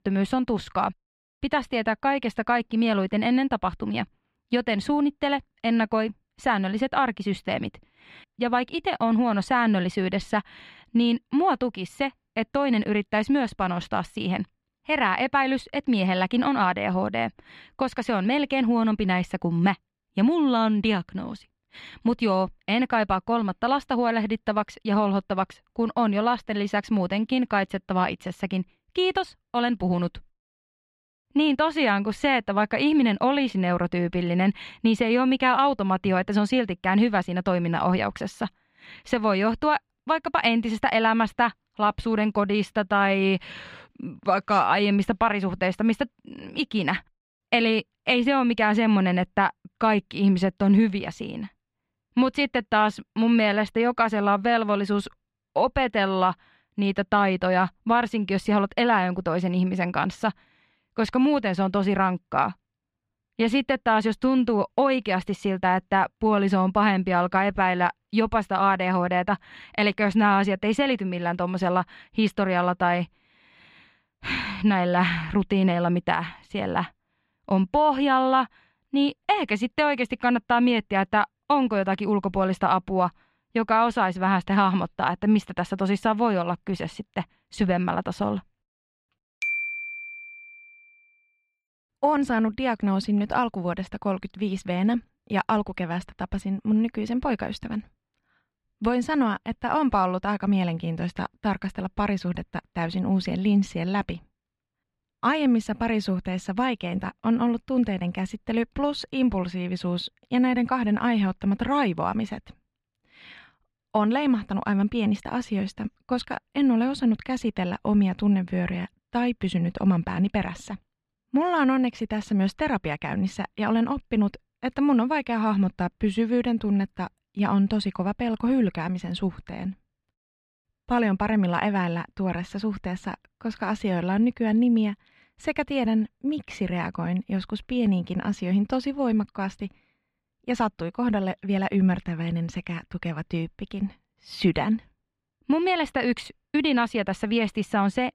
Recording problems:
muffled; very slightly; fading above 3 kHz

